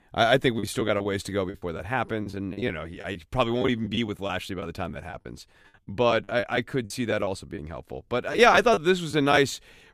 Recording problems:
choppy; very; 10% of the speech affected

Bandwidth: 15 kHz